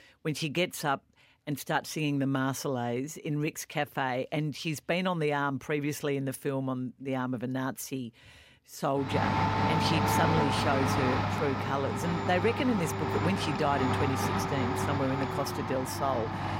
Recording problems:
household noises; very loud; from 9 s on; 1 dB above the speech

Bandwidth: 16 kHz